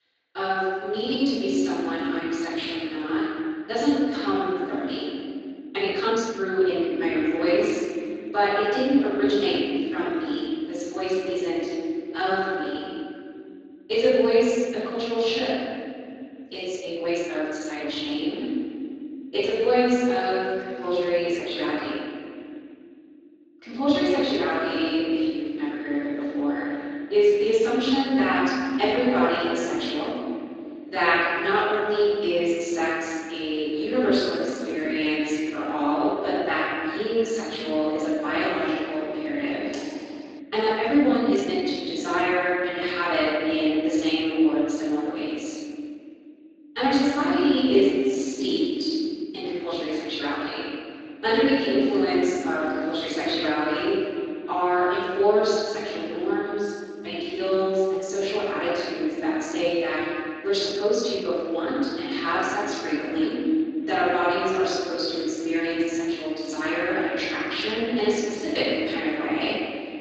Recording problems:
room echo; strong; dies away in 2.5 s
off-mic speech; far
garbled, watery; slightly; nothing above 7.5 kHz
thin; very slightly; fading below 300 Hz
uneven, jittery; strongly; from 5.5 s to 1:02
keyboard typing; faint; at 40 s; peak 15 dB below the speech

